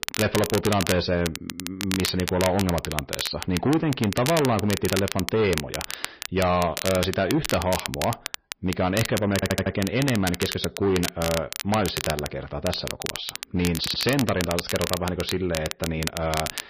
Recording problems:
distortion; slight; 8% of the sound clipped
garbled, watery; slightly; nothing above 5 kHz
high frequencies cut off; slight
crackle, like an old record; loud; 6 dB below the speech
audio stuttering; at 9.5 s and at 14 s

